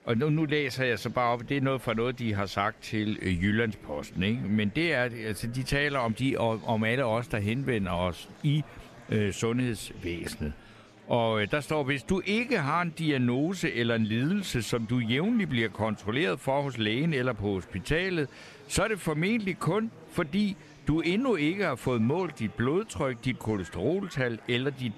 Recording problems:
murmuring crowd; faint; throughout; 20 dB below the speech

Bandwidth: 13.5 kHz